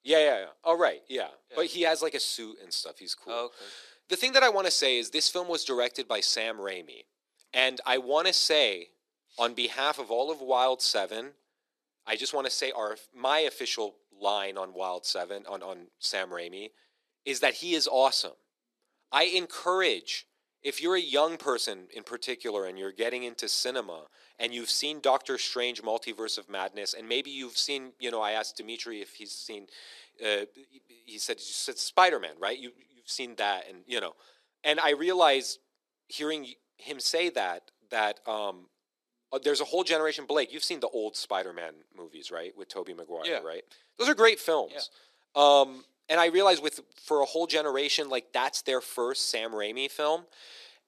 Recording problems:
thin; very; fading below 300 Hz

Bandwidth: 13.5 kHz